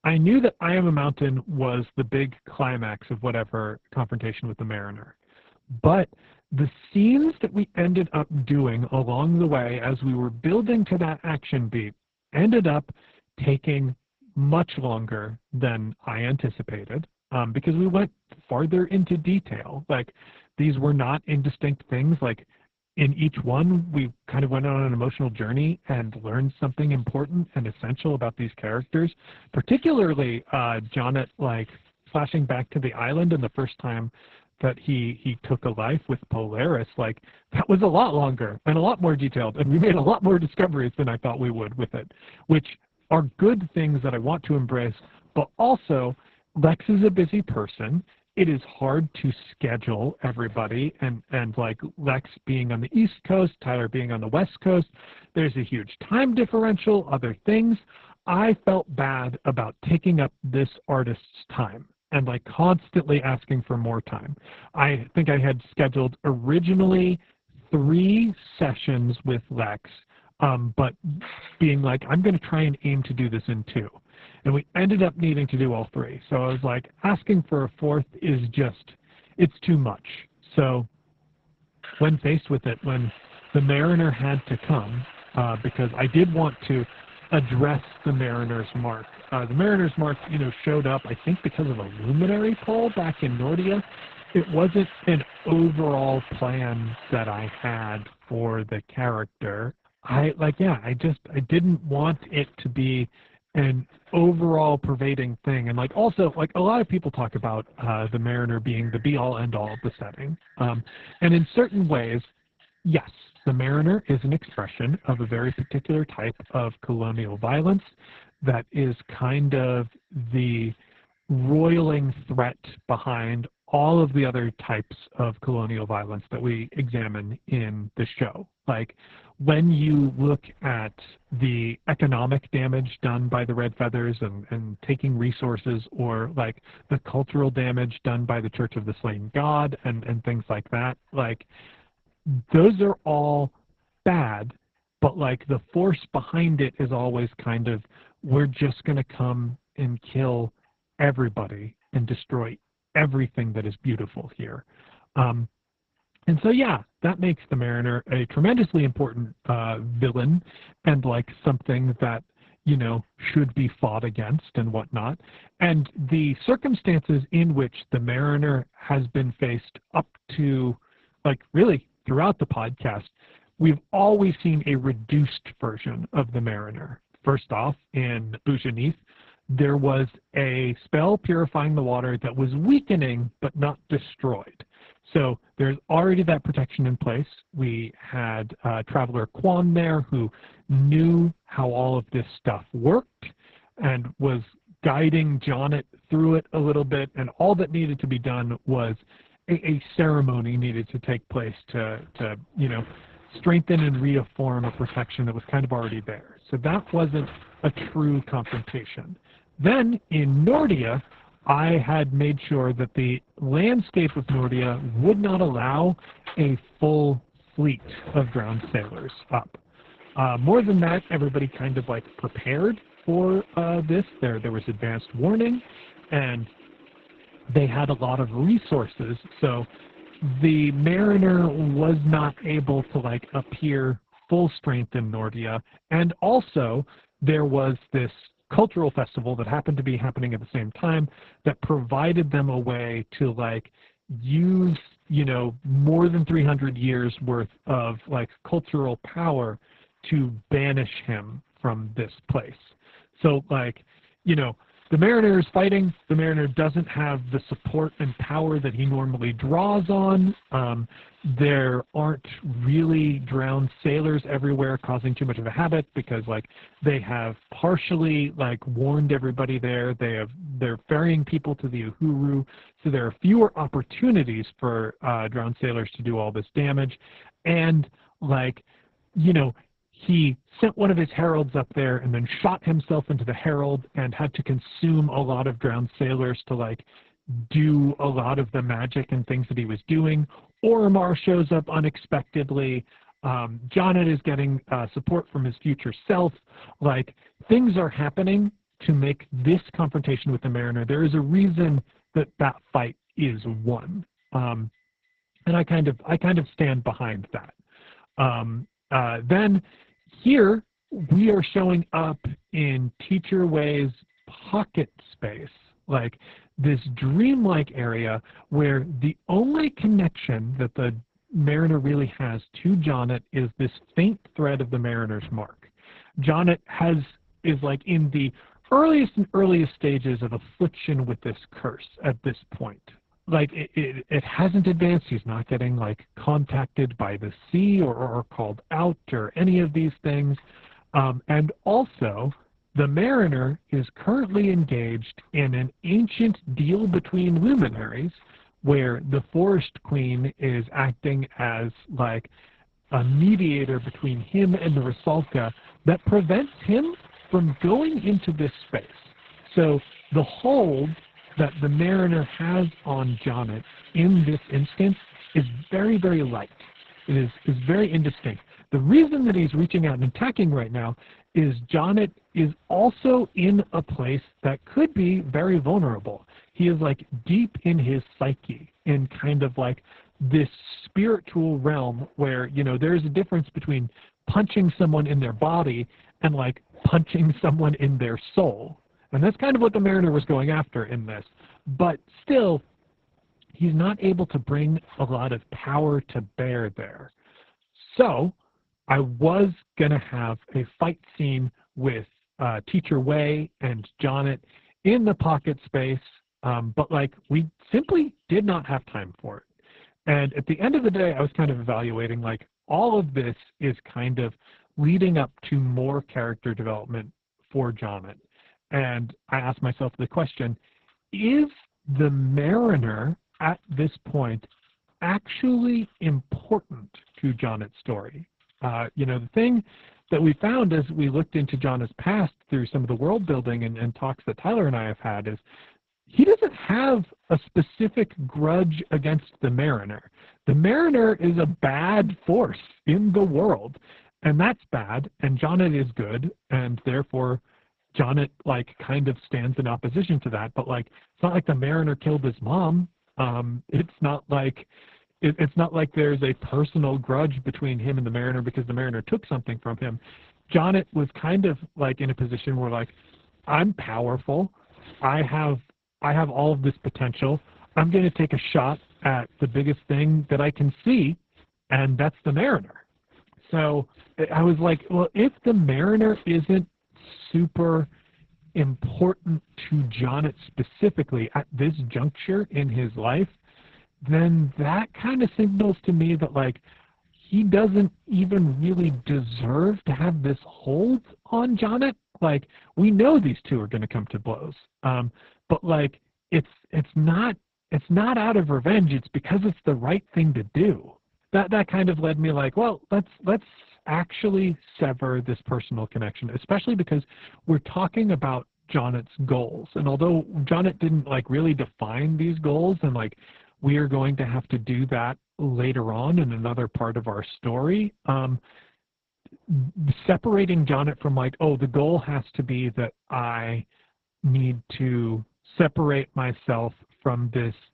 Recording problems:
garbled, watery; badly
household noises; faint; throughout; 25 dB below the speech

